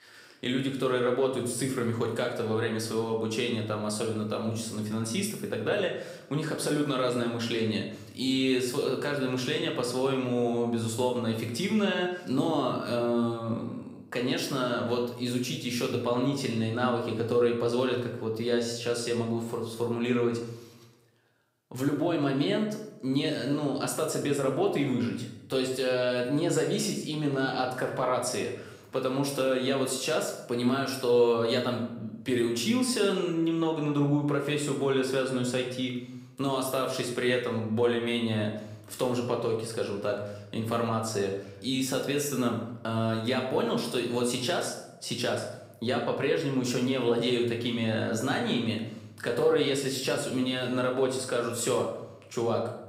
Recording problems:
room echo; noticeable; dies away in 0.7 s
off-mic speech; somewhat distant

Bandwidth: 15.5 kHz